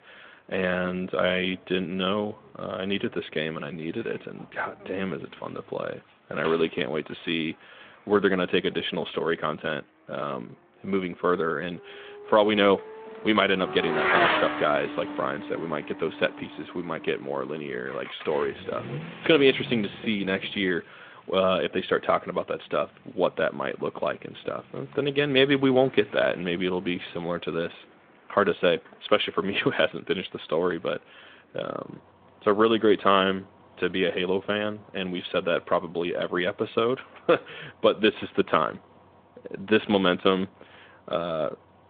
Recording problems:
phone-call audio; nothing above 3.5 kHz
traffic noise; loud; throughout; 7 dB below the speech

